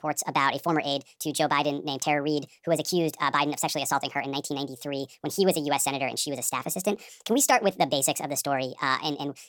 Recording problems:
wrong speed and pitch; too fast and too high; 1.5 times normal speed

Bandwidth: 17 kHz